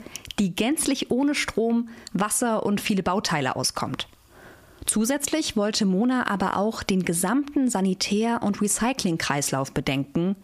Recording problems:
squashed, flat; somewhat

